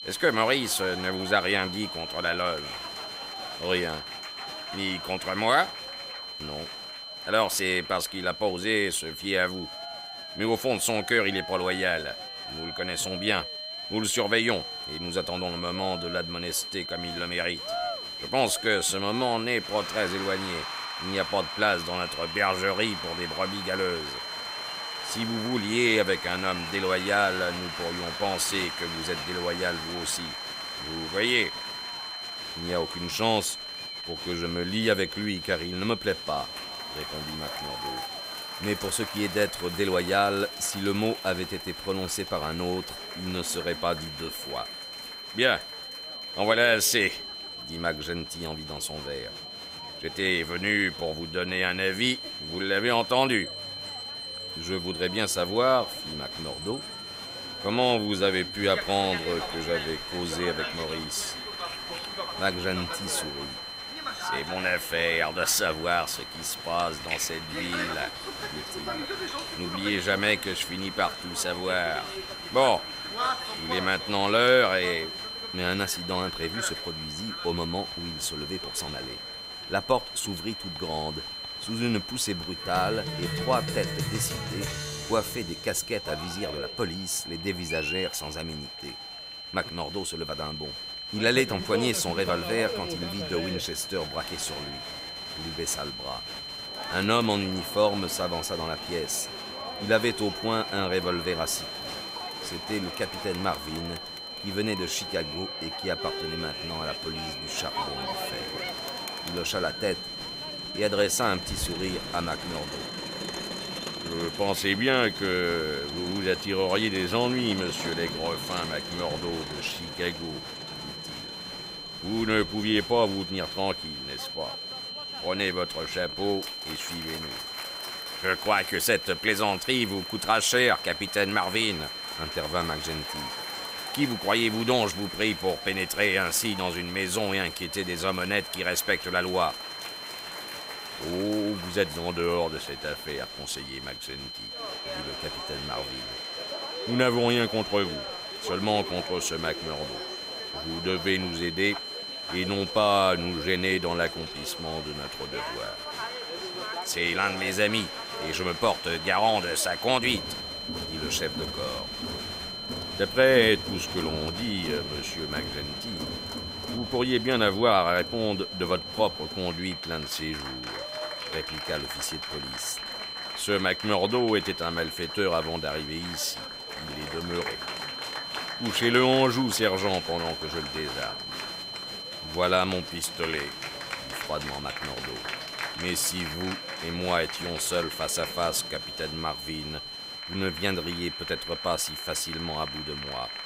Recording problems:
high-pitched whine; loud; throughout; 4 kHz, 8 dB below the speech
crowd noise; noticeable; throughout; 10 dB below the speech

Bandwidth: 15.5 kHz